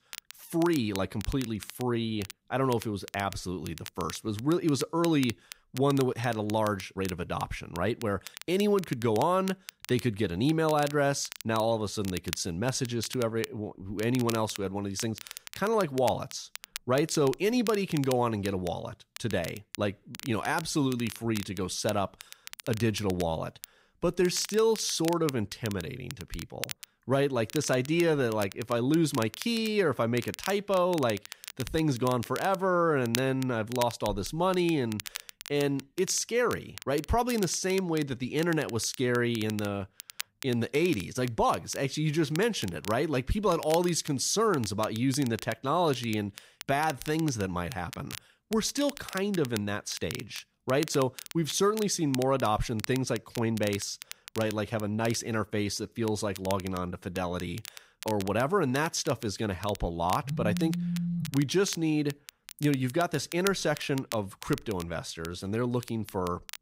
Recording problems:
crackle, like an old record; noticeable; 15 dB below the speech
phone ringing; noticeable; from 1:00 to 1:01; peak 2 dB below the speech

